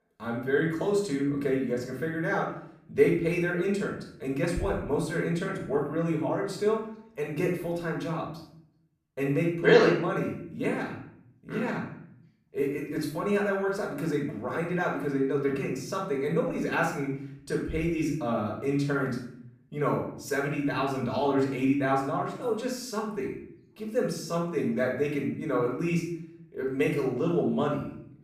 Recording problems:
off-mic speech; far
room echo; noticeable; dies away in 0.6 s

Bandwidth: 15 kHz